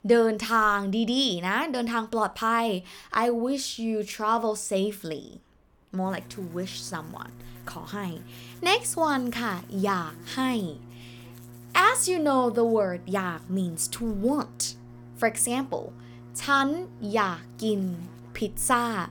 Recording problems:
electrical hum; faint; from 6 s on; 60 Hz, 25 dB below the speech

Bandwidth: 18.5 kHz